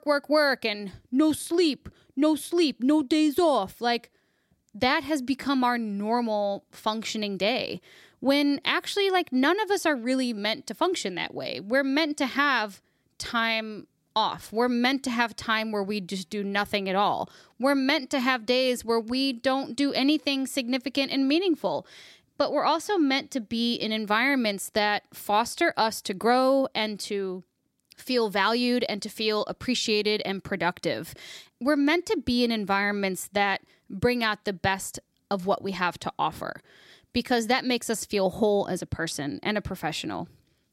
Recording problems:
none

